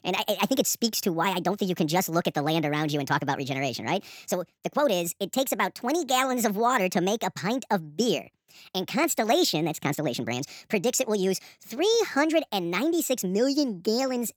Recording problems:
wrong speed and pitch; too fast and too high; 1.5 times normal speed

